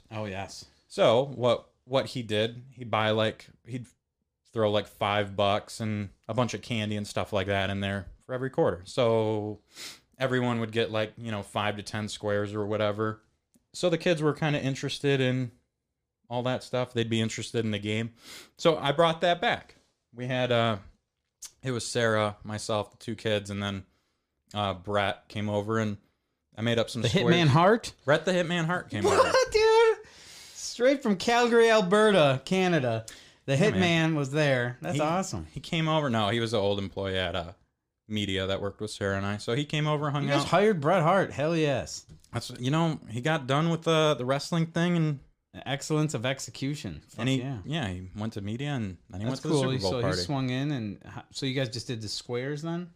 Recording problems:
none

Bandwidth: 14.5 kHz